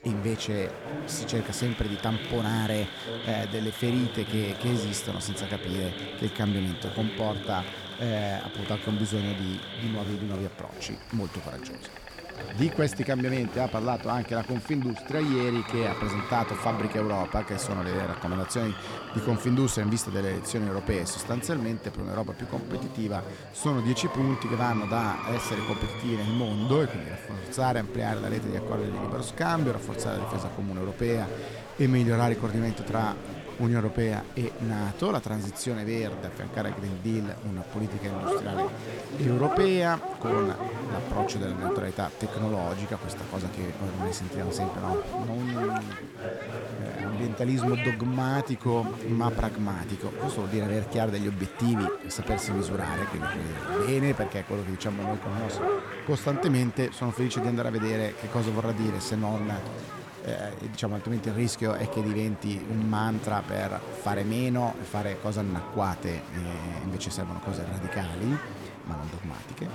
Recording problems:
animal sounds; loud; throughout; 8 dB below the speech
chatter from many people; loud; throughout; 8 dB below the speech

